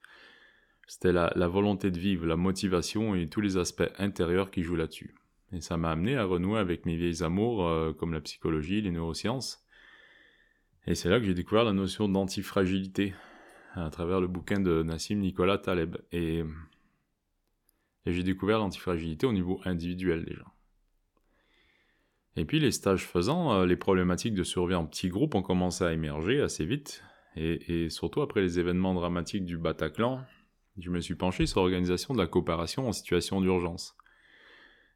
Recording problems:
none

